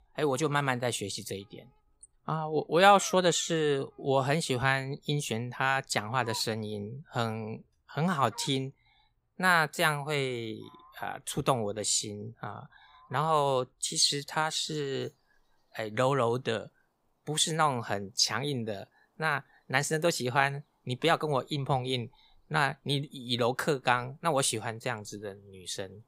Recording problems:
animal sounds; faint; throughout; 20 dB below the speech

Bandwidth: 15.5 kHz